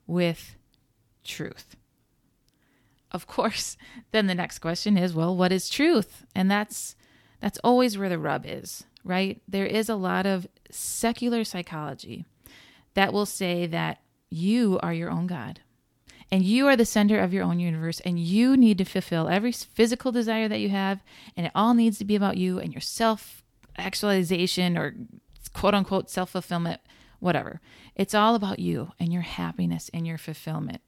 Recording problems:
none

